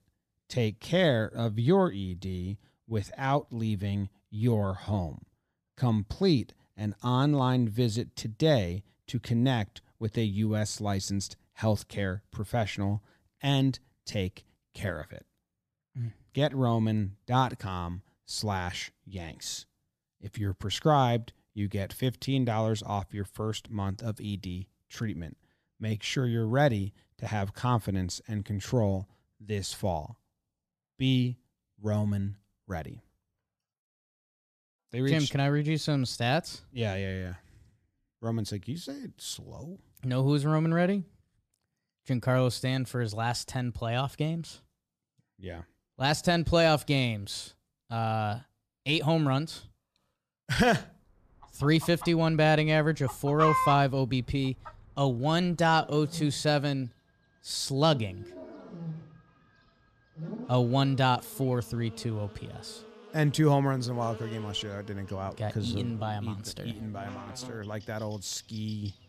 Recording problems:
animal sounds; loud; from 51 s on; 9 dB below the speech

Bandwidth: 14.5 kHz